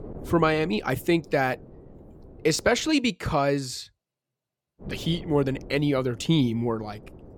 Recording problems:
wind noise on the microphone; occasional gusts; until 3 s and from 5 s on; 20 dB below the speech

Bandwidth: 17.5 kHz